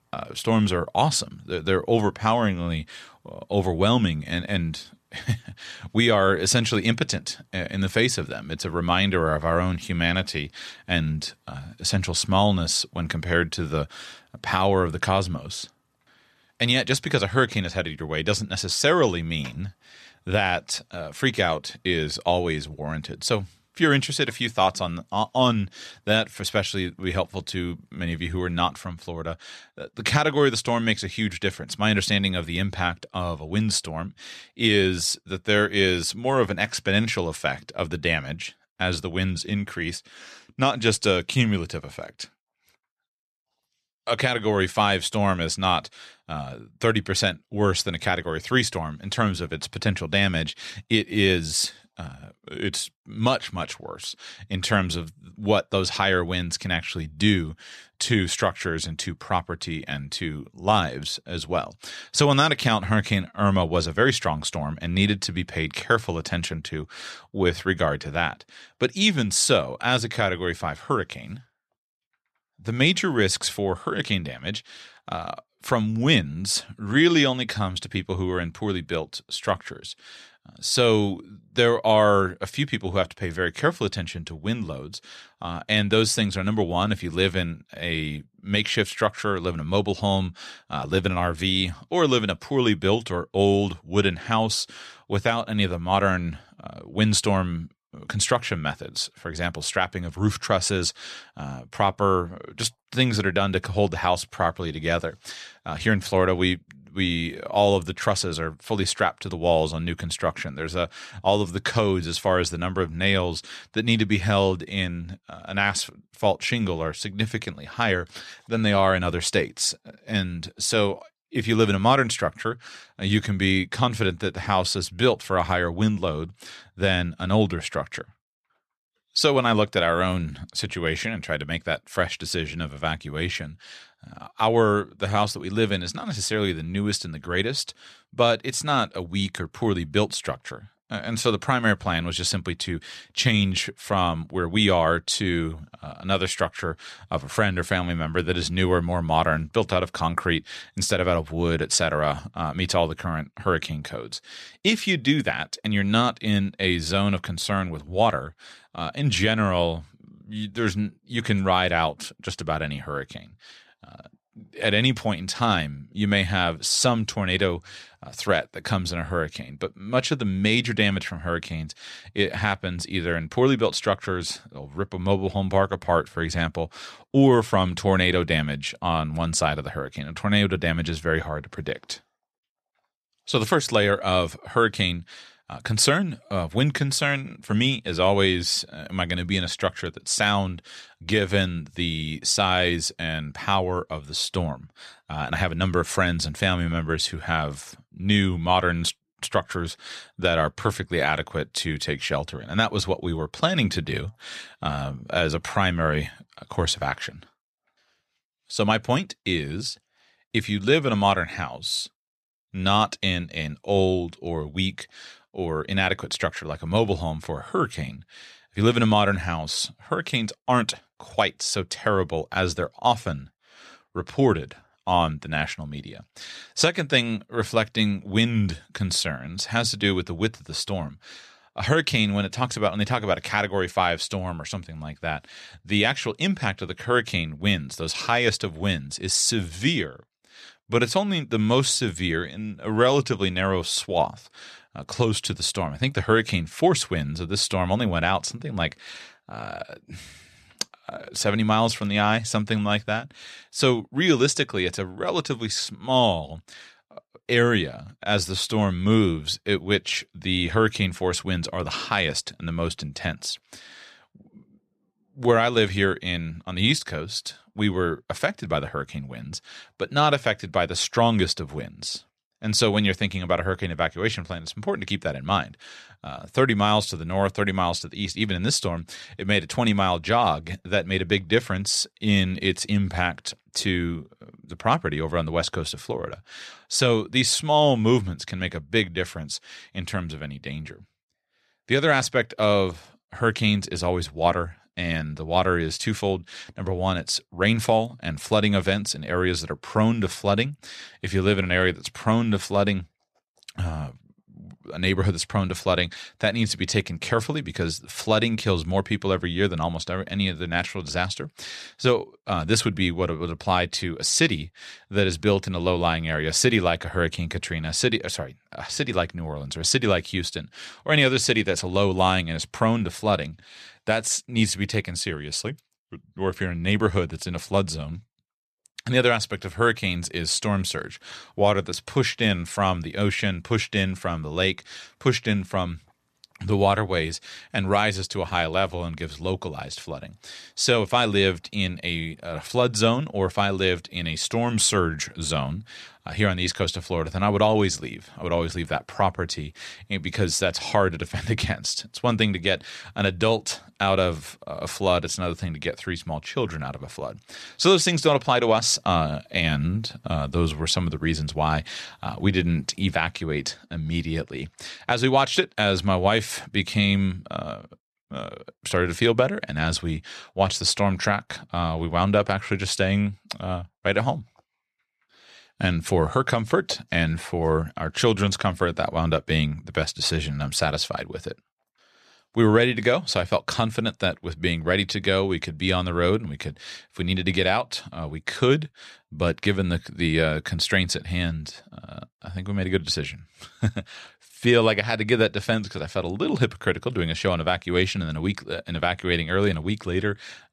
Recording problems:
none

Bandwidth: 13.5 kHz